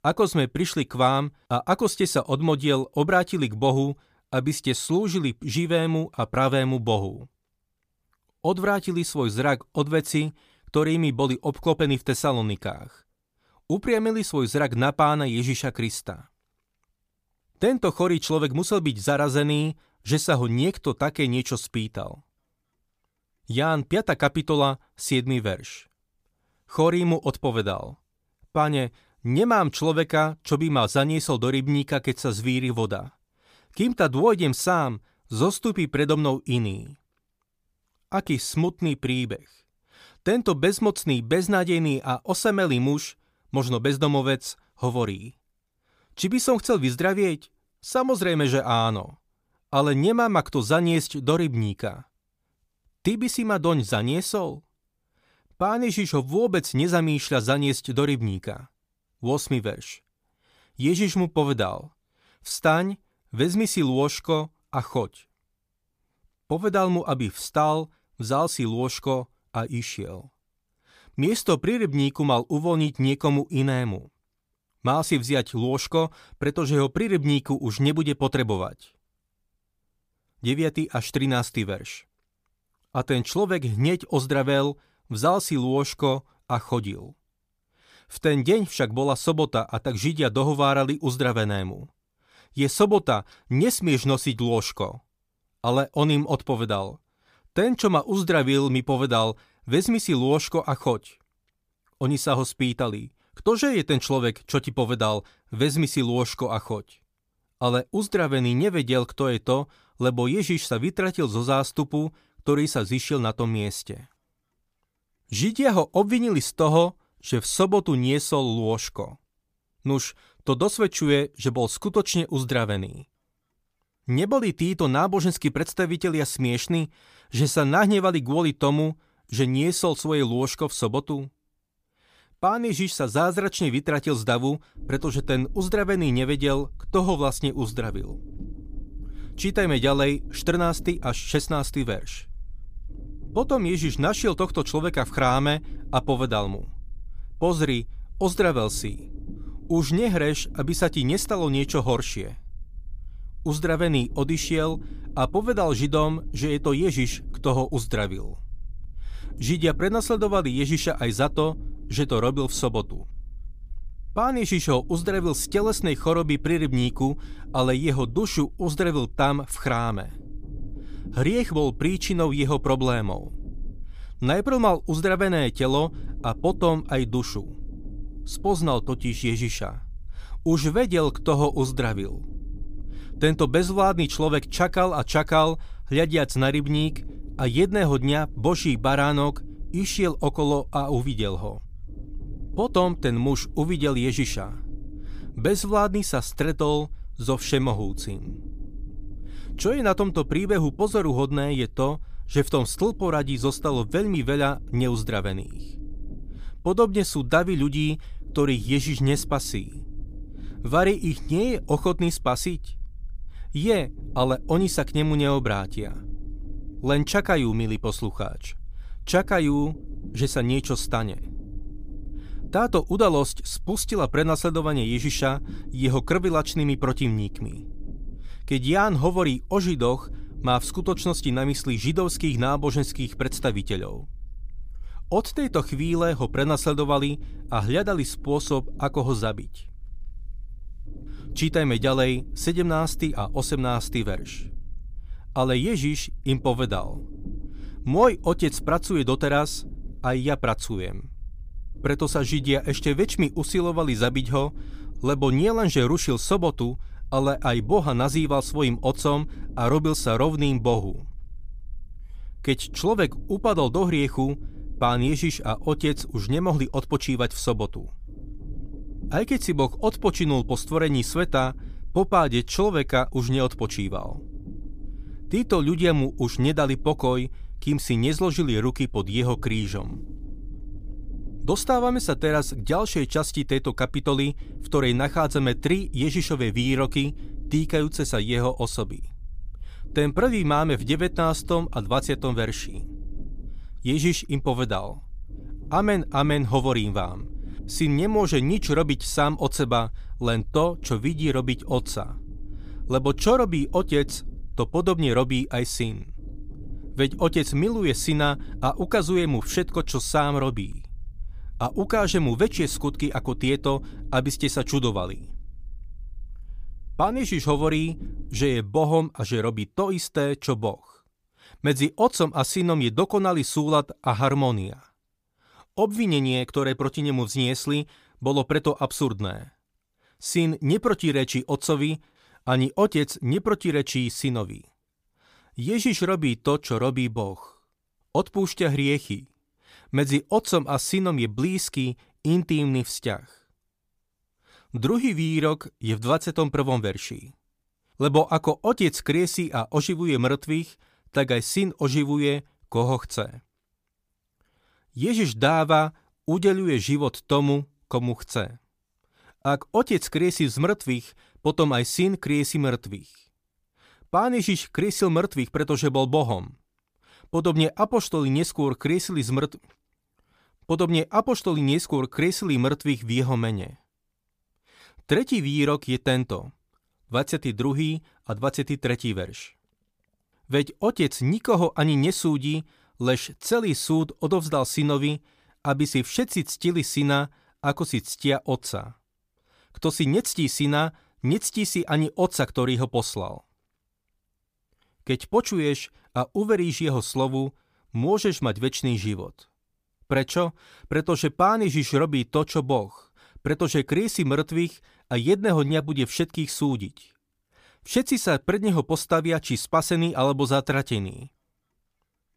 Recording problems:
low rumble; faint; from 2:15 to 5:19; 25 dB below the speech

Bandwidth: 15 kHz